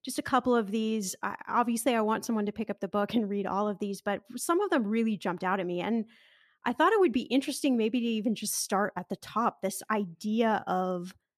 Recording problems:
none

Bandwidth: 14 kHz